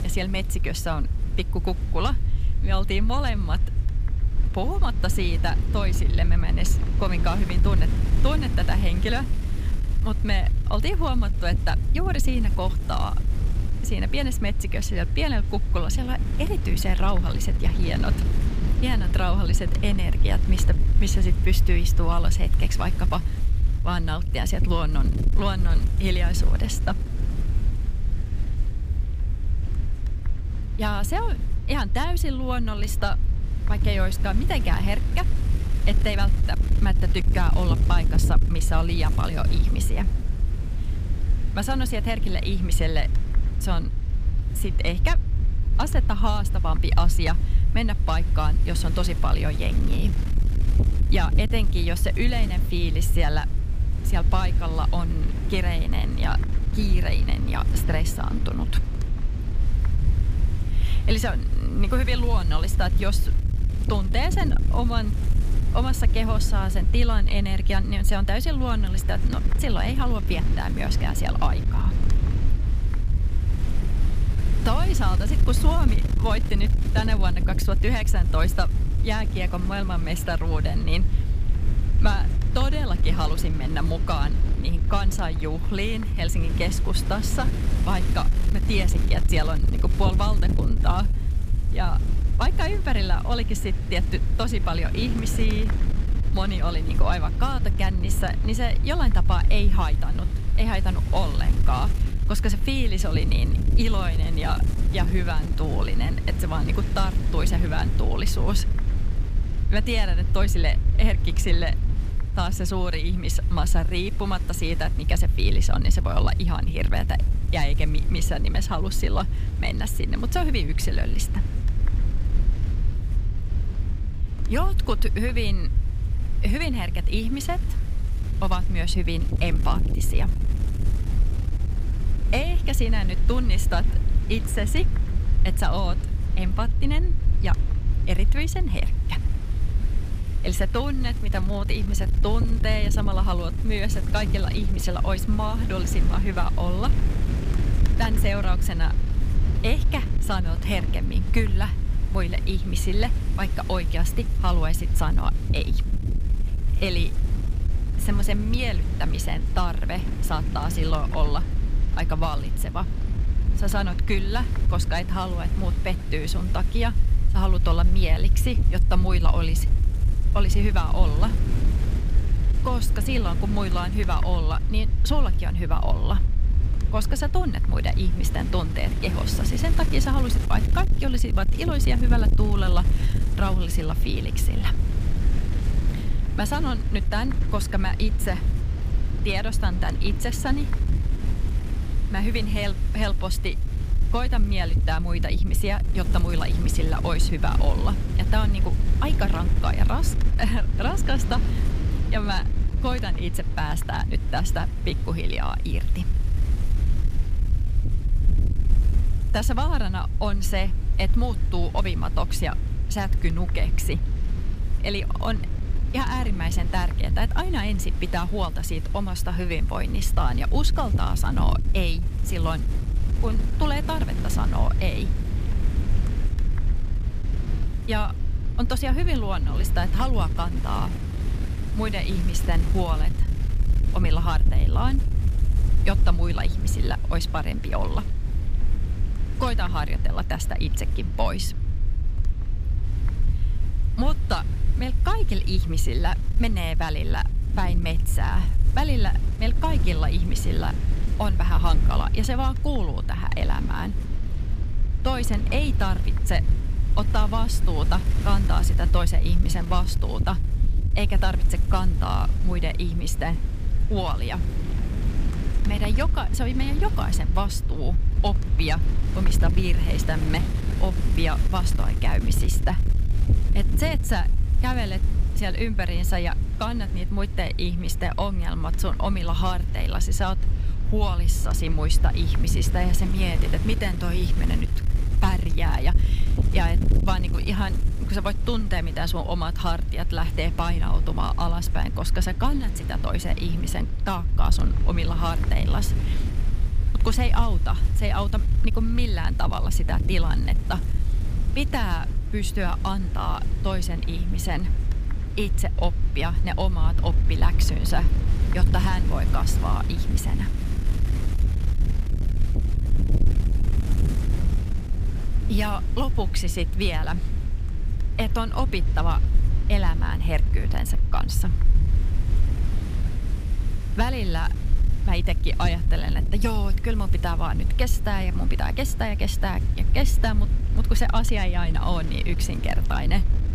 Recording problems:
wind noise on the microphone; occasional gusts; 10 dB below the speech
low rumble; noticeable; throughout; 15 dB below the speech

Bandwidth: 15 kHz